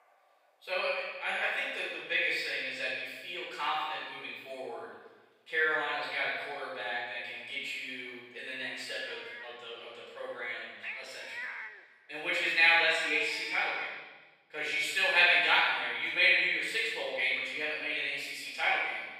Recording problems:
room echo; strong; dies away in 1.2 s
off-mic speech; far
thin; very; fading below 650 Hz
animal sounds; noticeable; until 14 s; 10 dB below the speech

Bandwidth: 15.5 kHz